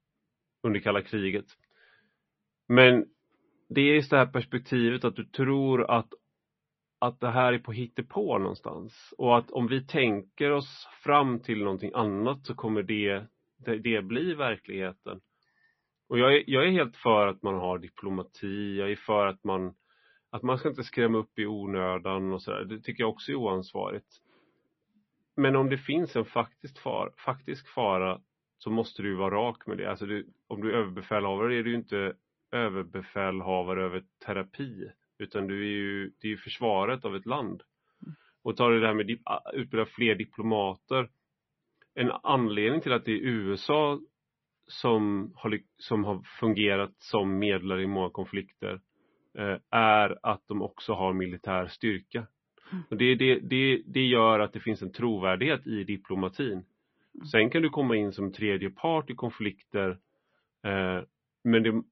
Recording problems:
garbled, watery; slightly; nothing above 5.5 kHz
muffled; very slightly; fading above 2.5 kHz

